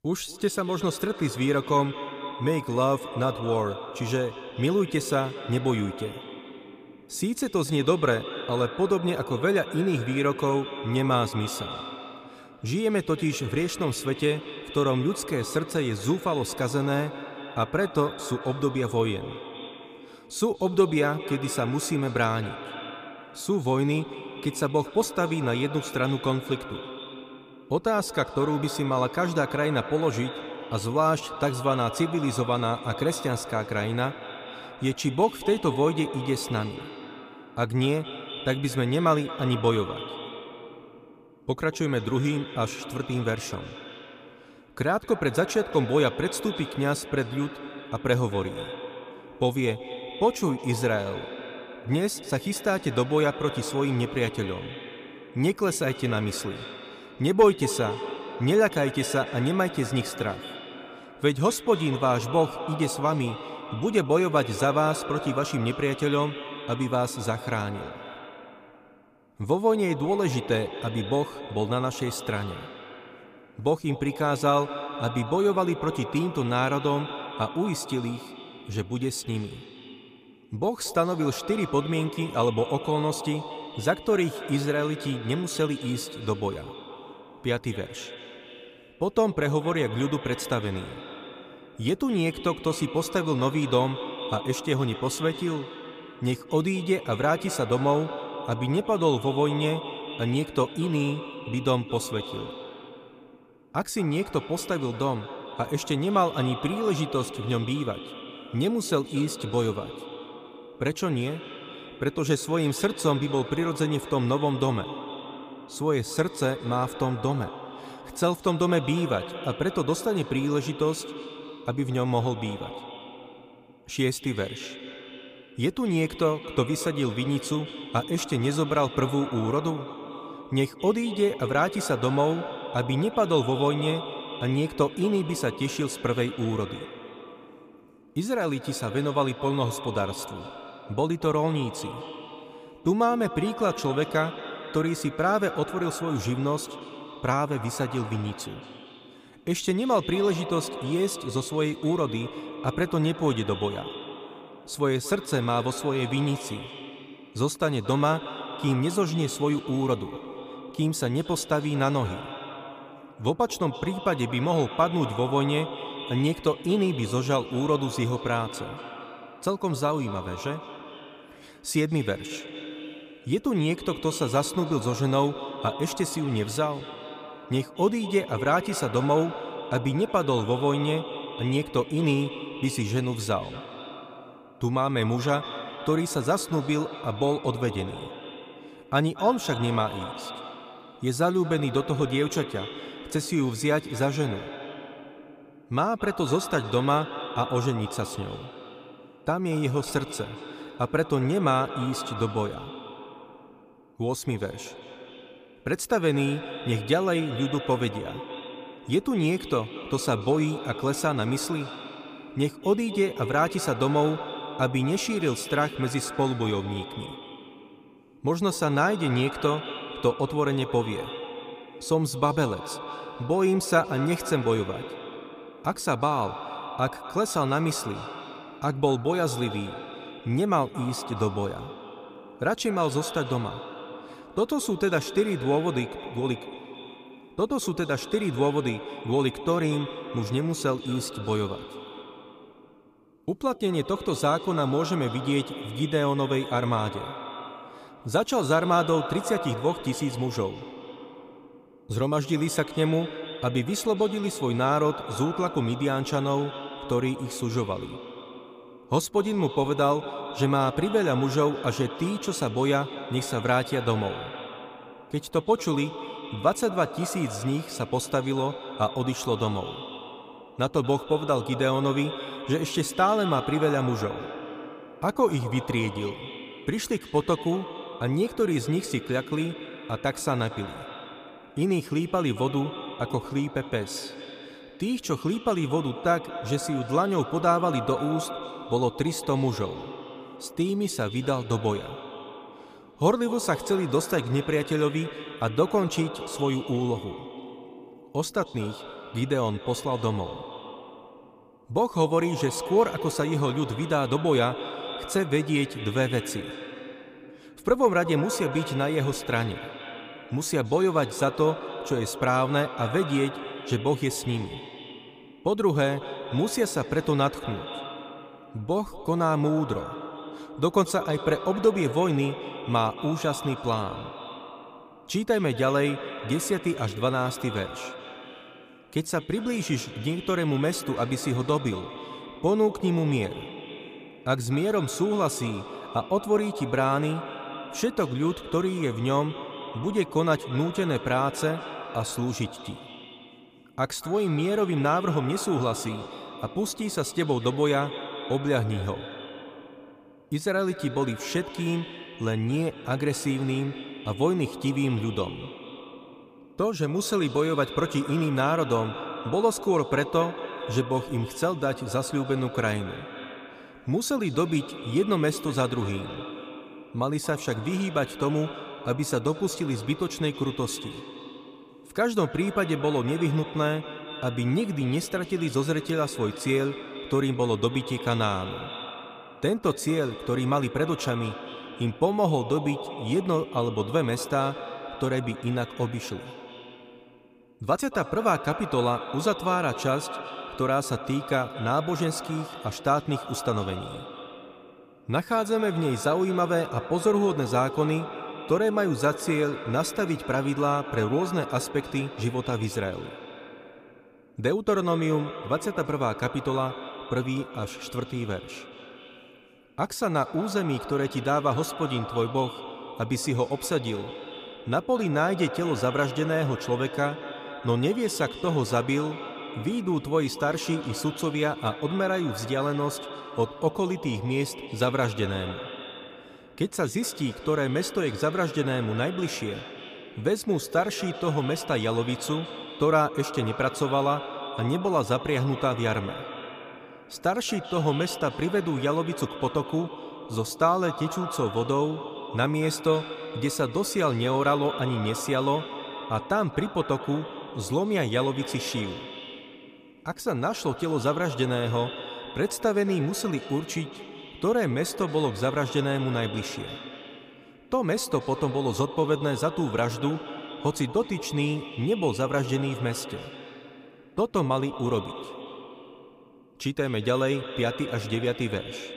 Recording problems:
echo of what is said; strong; throughout; 230 ms later, 10 dB below the speech

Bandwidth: 15 kHz